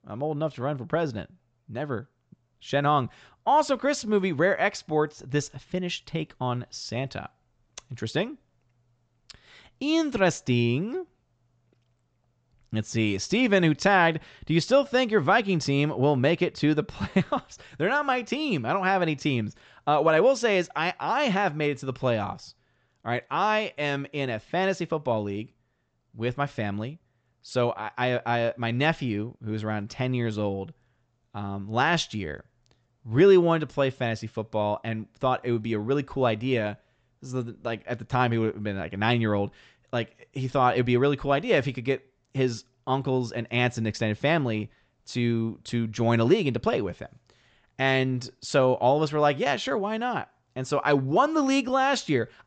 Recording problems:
high frequencies cut off; noticeable; nothing above 8 kHz

